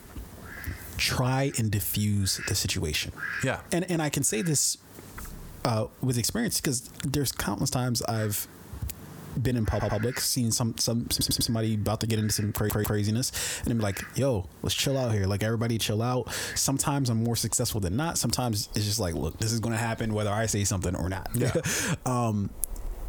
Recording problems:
squashed, flat; heavily, background pumping
animal sounds; noticeable; throughout; 15 dB below the speech
audio stuttering; at 9.5 s, at 11 s and at 13 s

